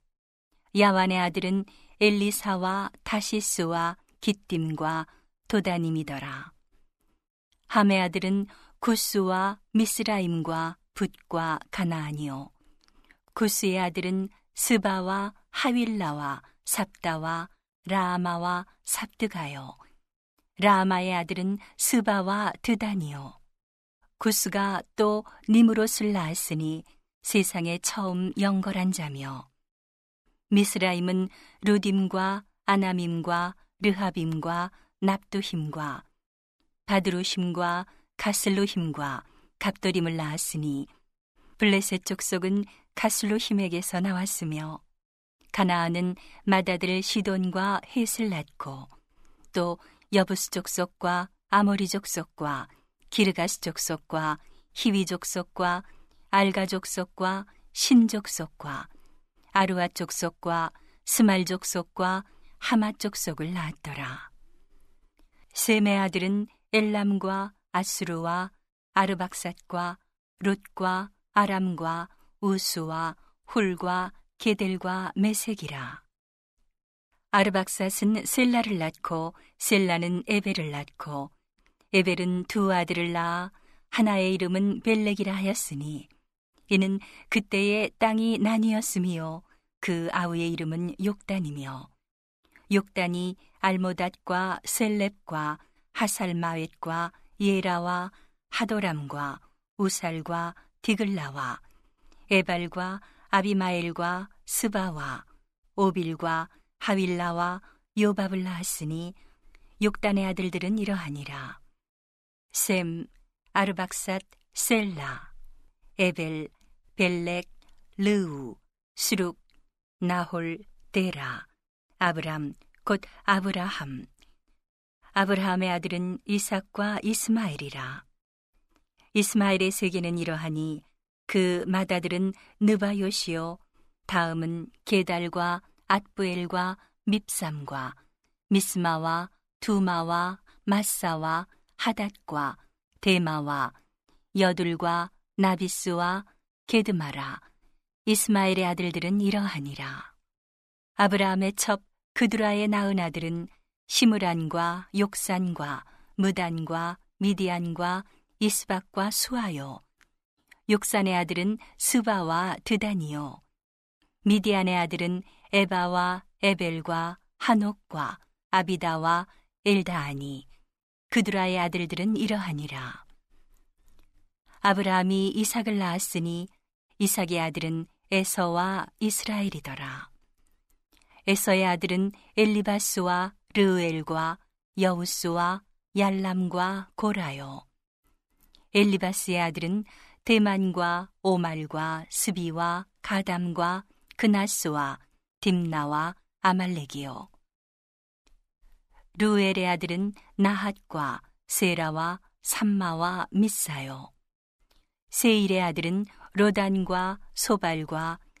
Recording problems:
none

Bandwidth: 14.5 kHz